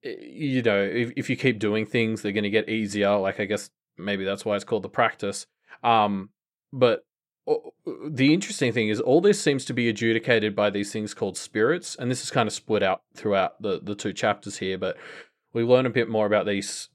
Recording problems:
none

